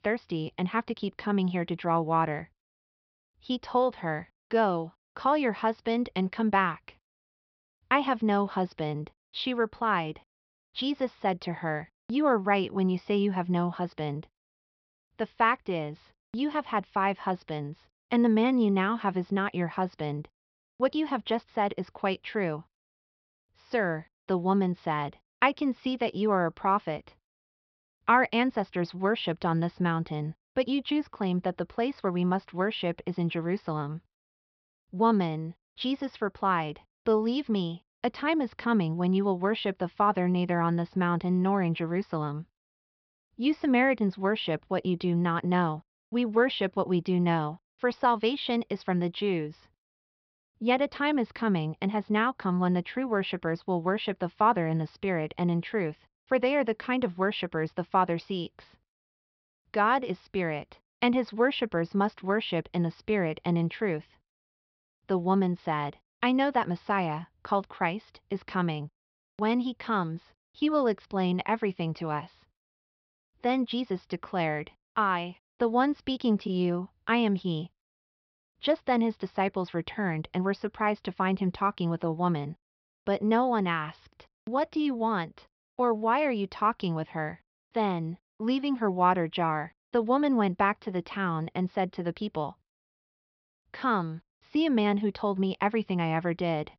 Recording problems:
high frequencies cut off; noticeable; nothing above 5.5 kHz

